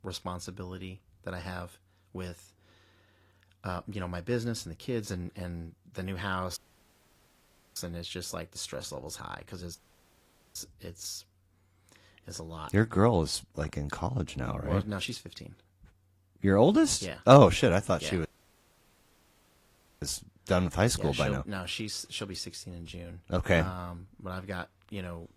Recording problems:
garbled, watery; slightly
audio cutting out; at 6.5 s for 1 s, at 10 s for 1 s and at 18 s for 2 s

